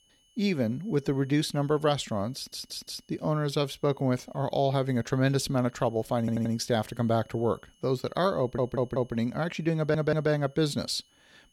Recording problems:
high-pitched whine; faint; throughout; 3 kHz, 35 dB below the speech
audio stuttering; 4 times, first at 2.5 s

